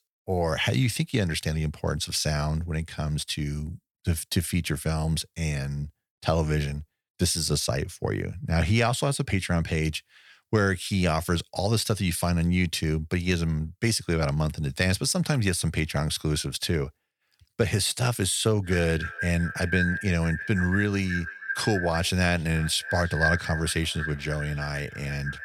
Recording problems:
echo of what is said; strong; from 19 s on; 330 ms later, 6 dB below the speech

